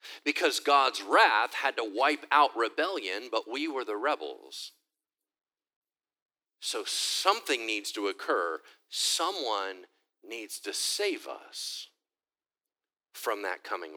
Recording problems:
thin; somewhat; fading below 300 Hz
abrupt cut into speech; at the end

